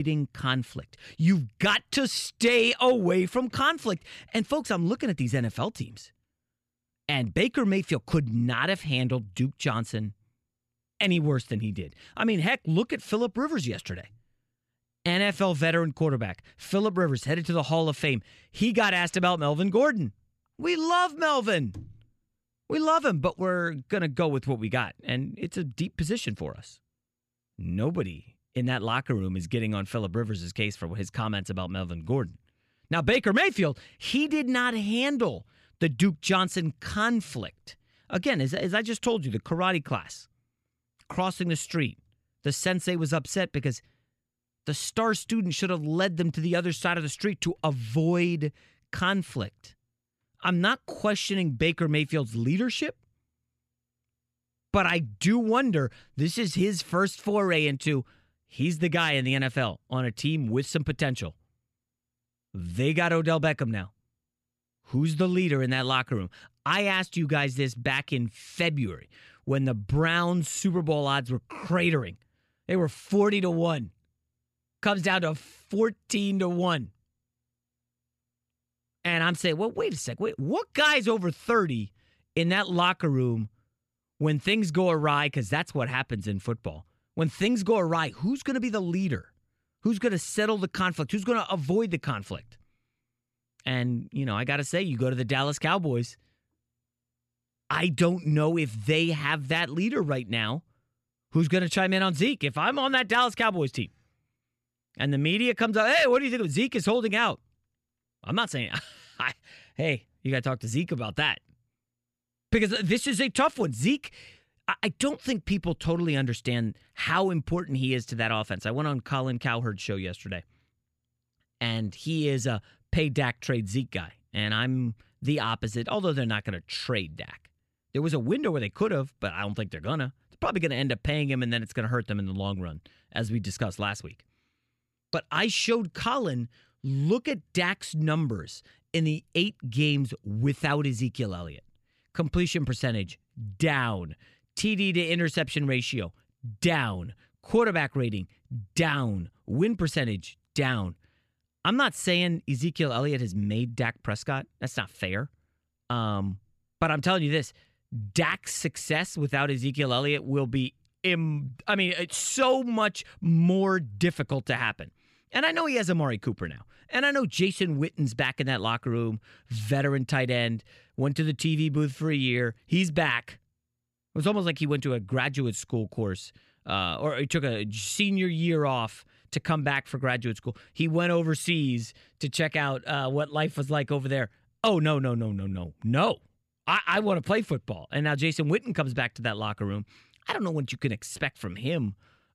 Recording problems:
abrupt cut into speech; at the start

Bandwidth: 15 kHz